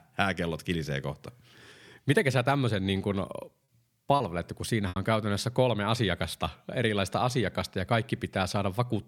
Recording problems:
choppy; very; at 4 s; 7% of the speech affected

